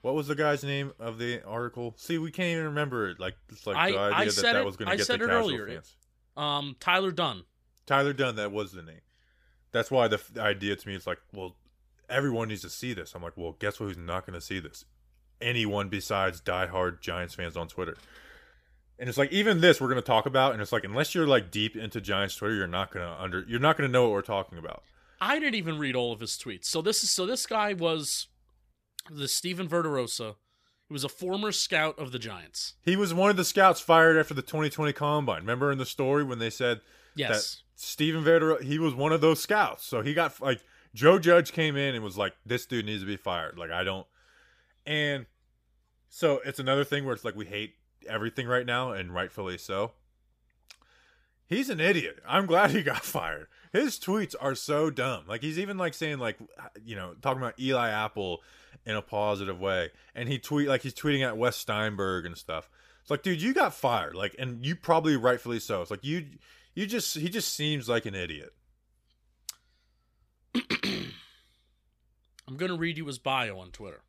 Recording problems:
none

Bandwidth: 15 kHz